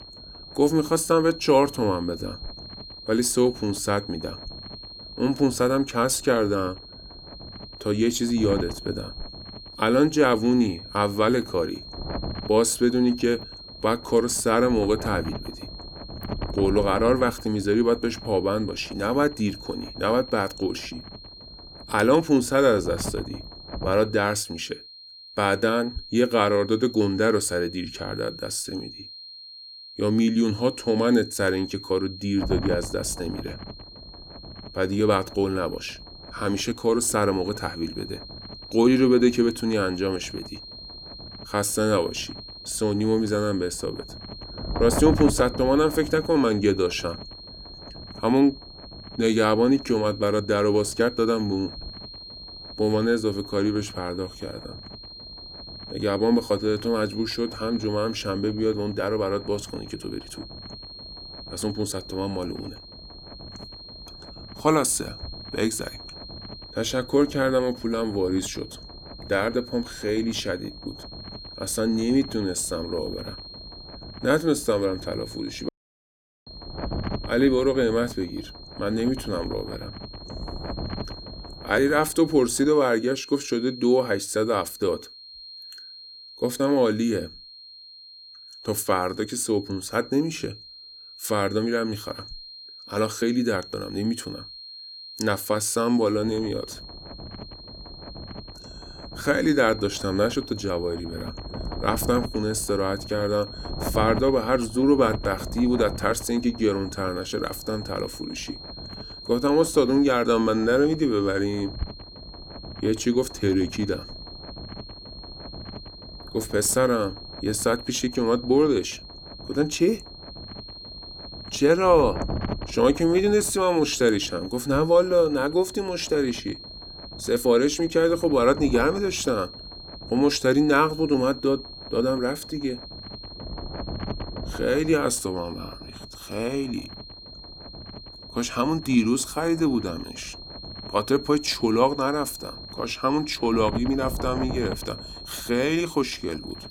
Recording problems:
high-pitched whine; noticeable; throughout; 4 kHz, 15 dB below the speech
wind noise on the microphone; occasional gusts; until 24 s, from 32 s to 1:23 and from 1:36 on; 20 dB below the speech
audio cutting out; at 1:16 for 1 s

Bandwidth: 18 kHz